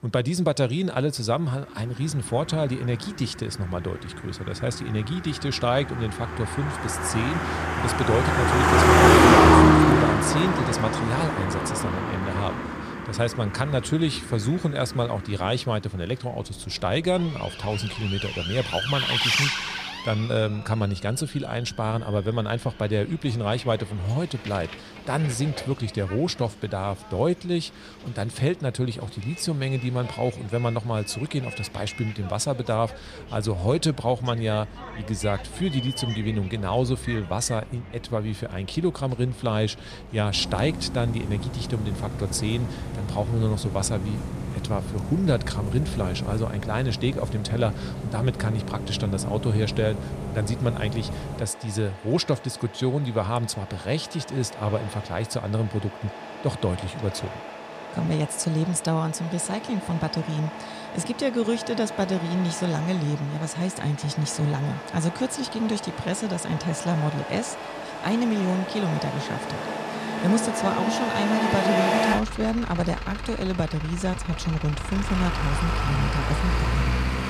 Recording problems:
traffic noise; very loud; throughout; 1 dB above the speech

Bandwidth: 14.5 kHz